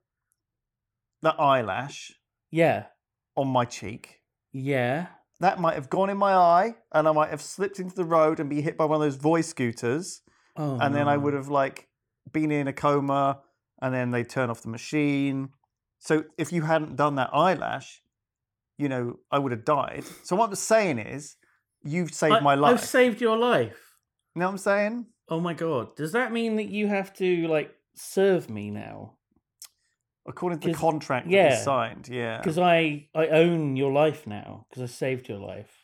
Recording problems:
none

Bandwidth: 17.5 kHz